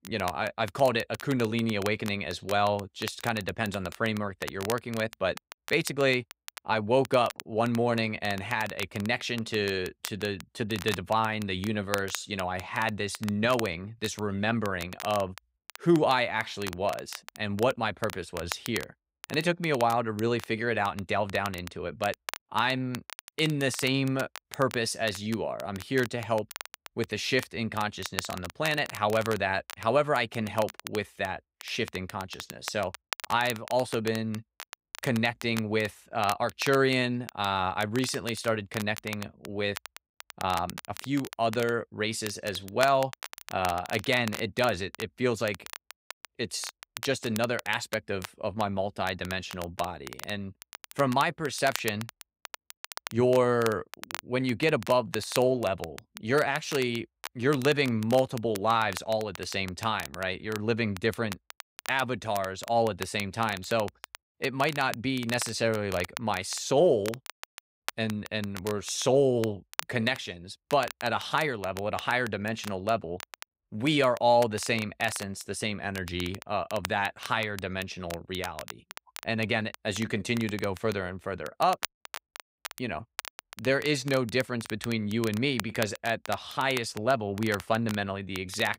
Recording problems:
crackle, like an old record; noticeable; 15 dB below the speech

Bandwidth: 15.5 kHz